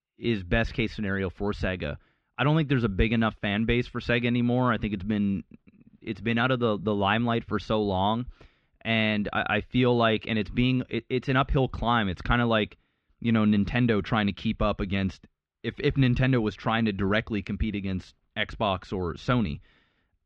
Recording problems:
muffled; very; fading above 3.5 kHz

